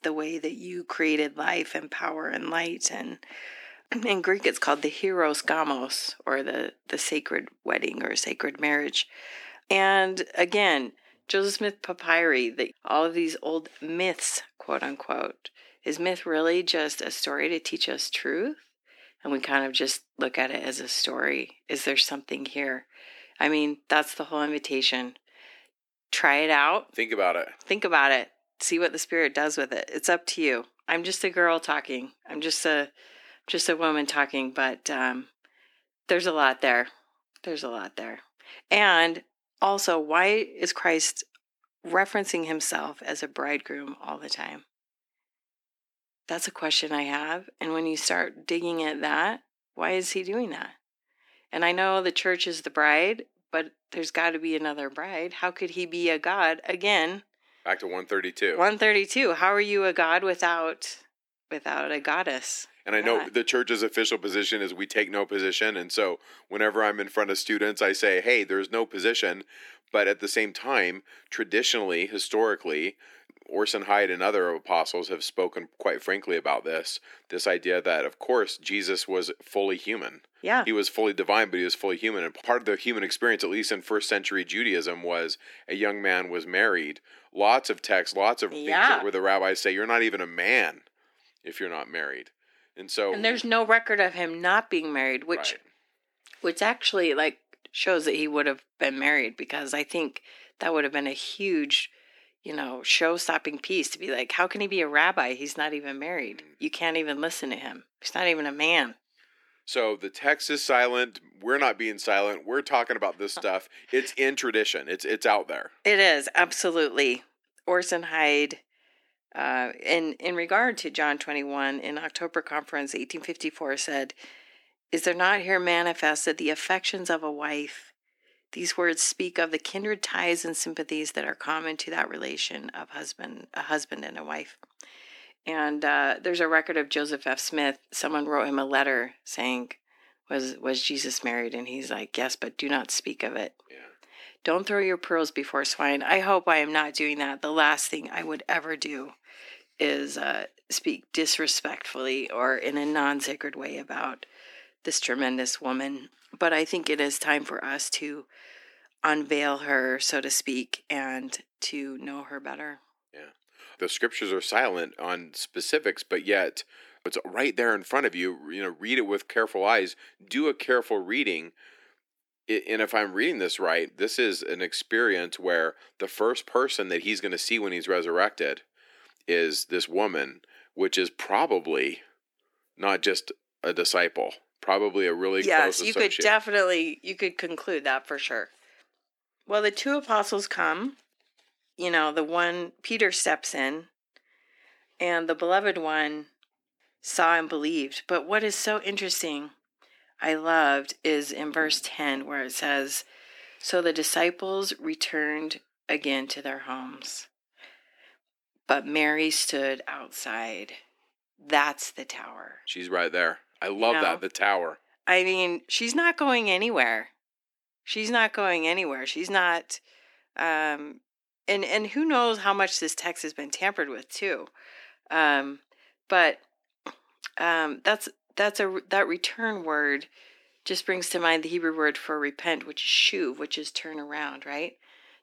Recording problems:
thin; somewhat; fading below 300 Hz

